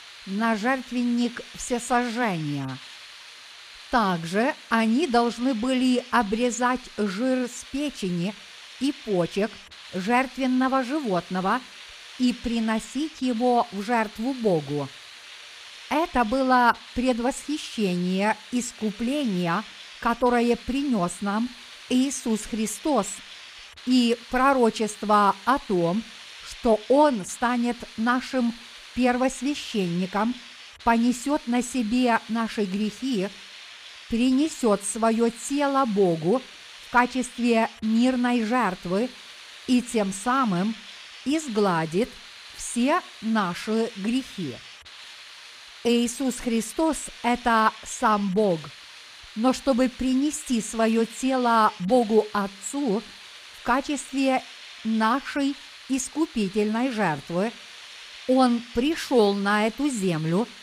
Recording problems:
hiss; noticeable; throughout; 15 dB below the speech

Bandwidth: 15 kHz